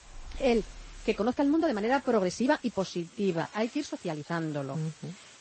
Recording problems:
garbled, watery; slightly; nothing above 8 kHz
animal sounds; faint; throughout; 25 dB below the speech
hiss; faint; throughout; 25 dB below the speech
uneven, jittery; strongly; from 1 to 4.5 s

